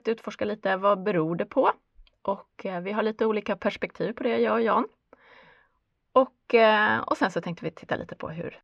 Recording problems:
muffled; slightly; fading above 2.5 kHz

